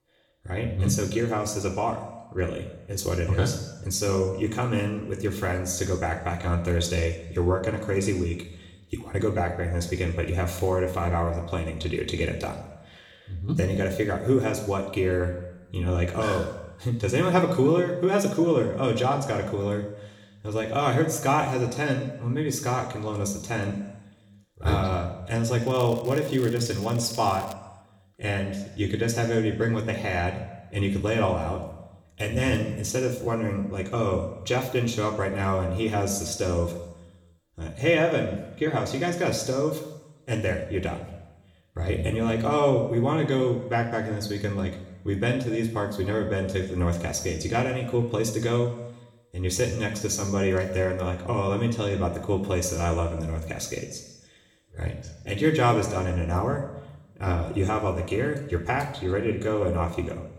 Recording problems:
room echo; slight; dies away in 1 s
off-mic speech; somewhat distant
crackling; noticeable; from 26 to 28 s; 20 dB below the speech

